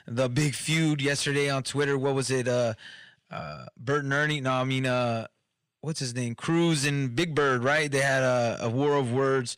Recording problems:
distortion; slight; 10 dB below the speech

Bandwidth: 15.5 kHz